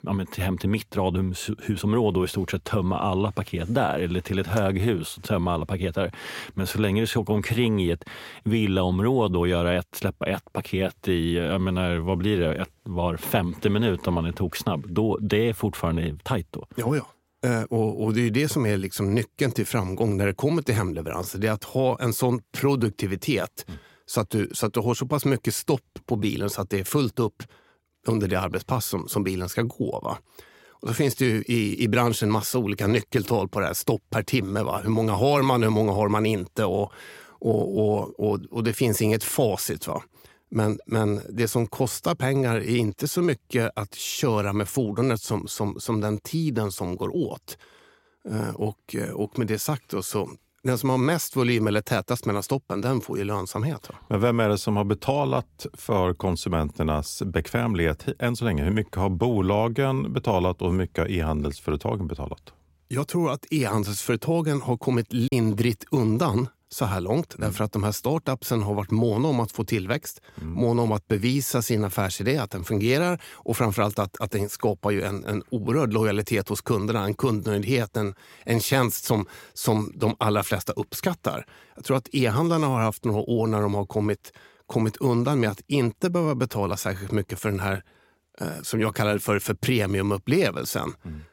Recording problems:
choppy; occasionally; at 1:05; 1% of the speech affected

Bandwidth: 16 kHz